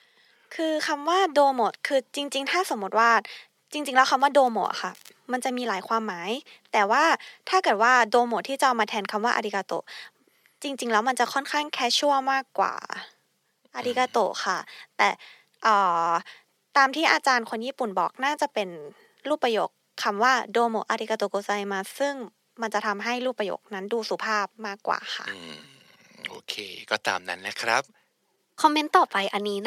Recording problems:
thin; somewhat; fading below 550 Hz
abrupt cut into speech; at the end

